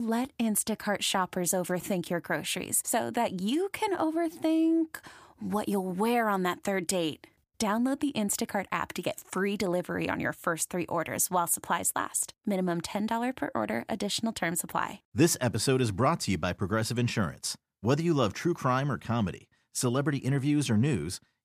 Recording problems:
abrupt cut into speech; at the start

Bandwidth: 15 kHz